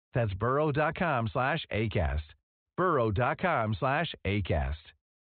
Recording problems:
high frequencies cut off; severe; nothing above 4 kHz

